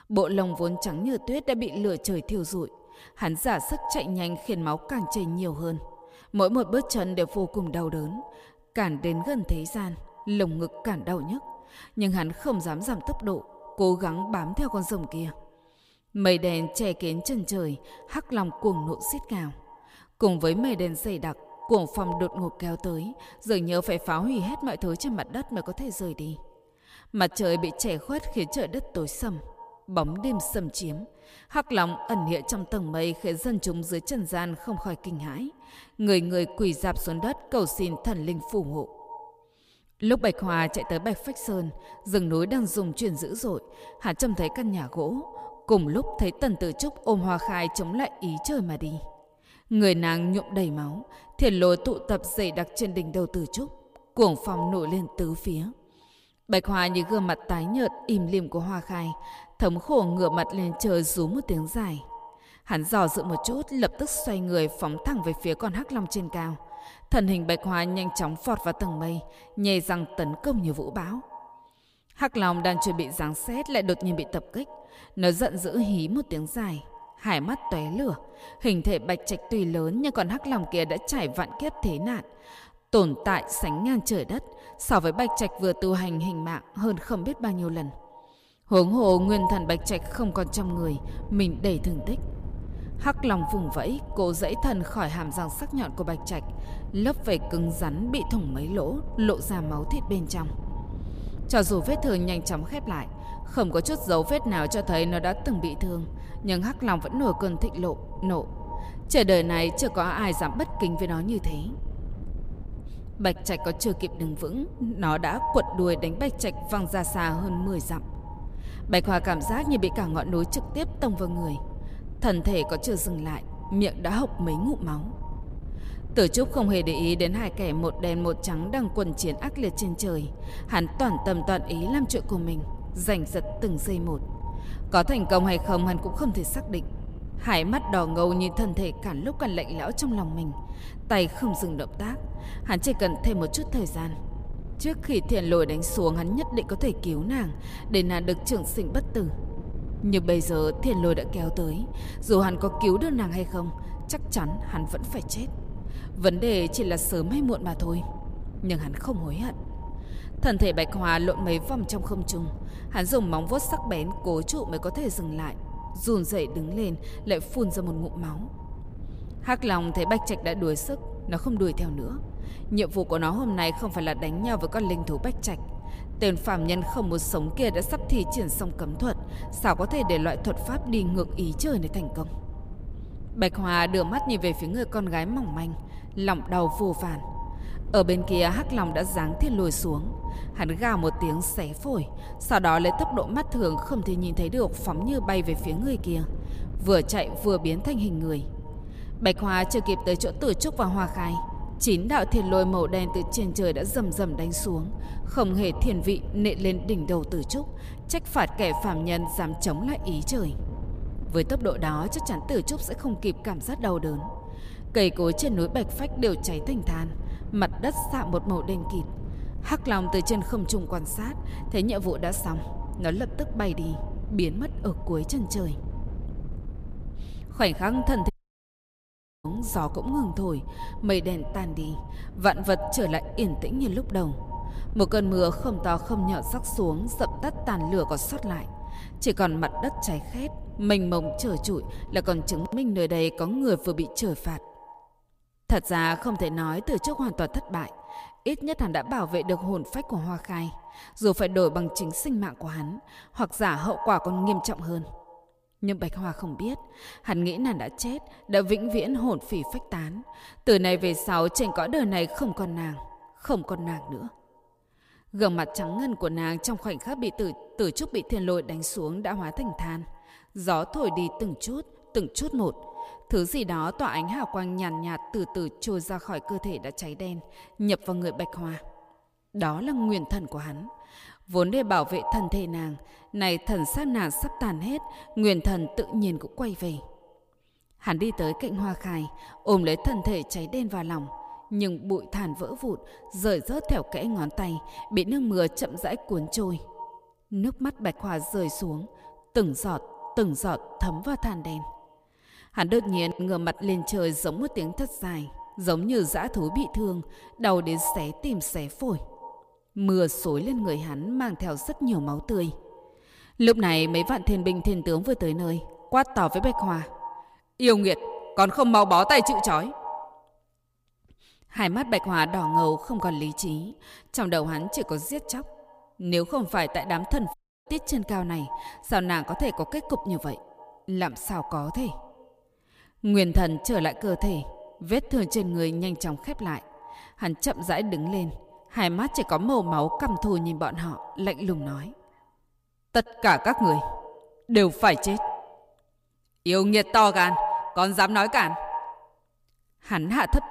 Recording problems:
echo of what is said; noticeable; throughout; 110 ms later, 15 dB below the speech
wind noise on the microphone; occasional gusts; from 1:29 to 4:03; 20 dB below the speech
audio cutting out; at 3:48 for 1 s and at 5:28

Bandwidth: 15 kHz